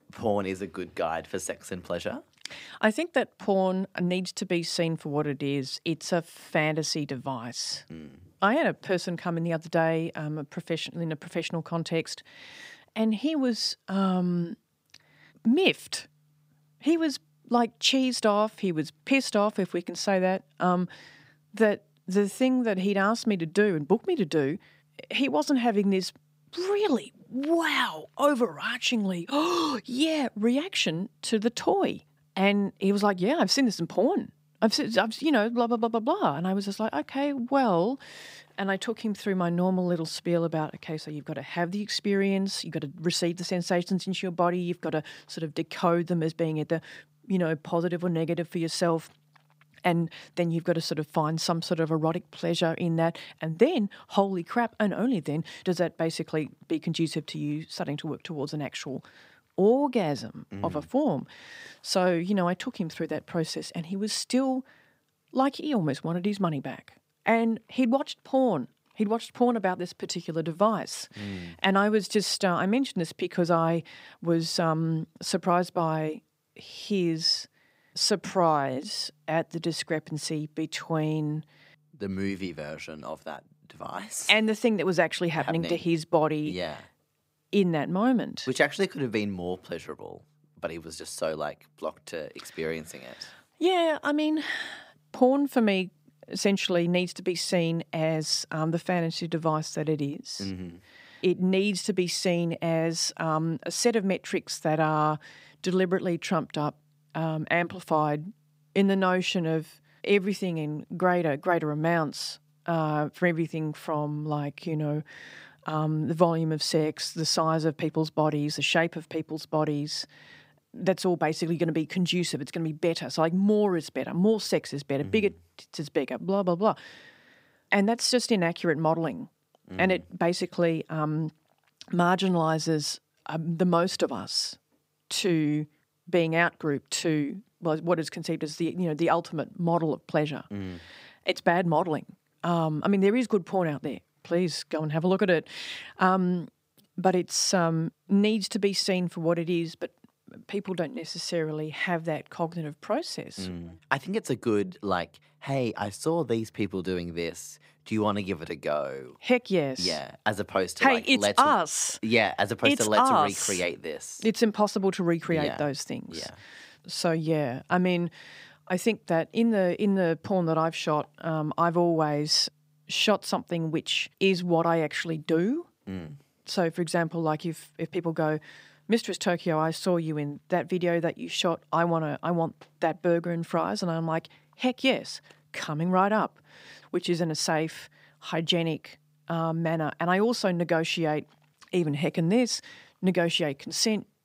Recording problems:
none

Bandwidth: 15.5 kHz